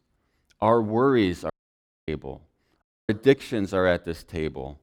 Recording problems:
audio cutting out; at 1.5 s for 0.5 s and at 3 s

